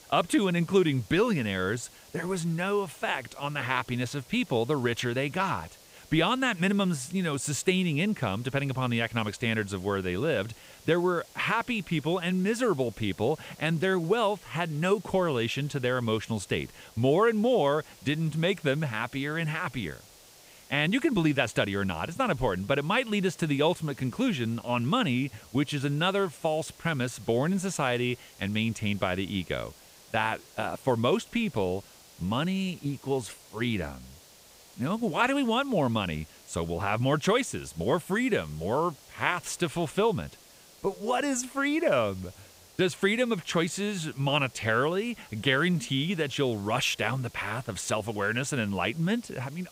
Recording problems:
hiss; faint; throughout; 25 dB below the speech

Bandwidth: 15.5 kHz